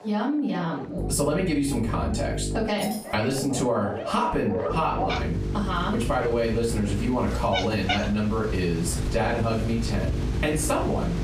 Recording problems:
off-mic speech; far
room echo; slight; dies away in 0.3 s
squashed, flat; somewhat
animal sounds; loud; throughout; 7 dB below the speech
electrical hum; noticeable; from 1 to 2.5 s, from 4.5 to 7.5 s and from 9 s on; 50 Hz, 15 dB below the speech
jangling keys; faint; at 3 s; peak 10 dB below the speech

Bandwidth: 15 kHz